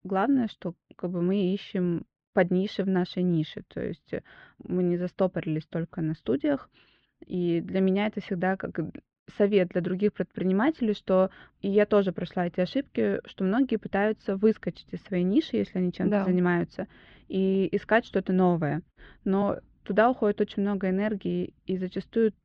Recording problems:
muffled; very; fading above 3 kHz

